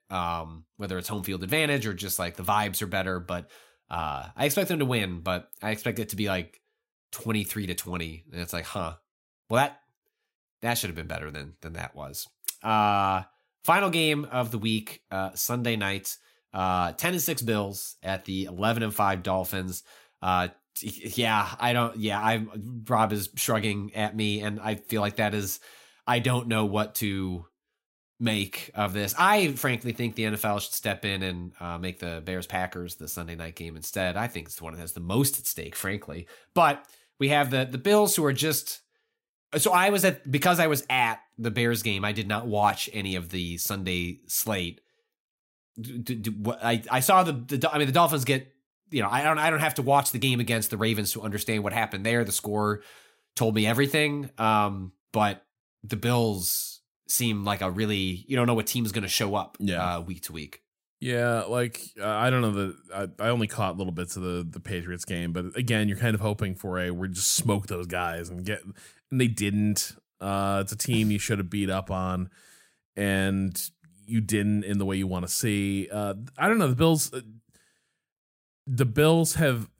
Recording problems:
none

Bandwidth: 16 kHz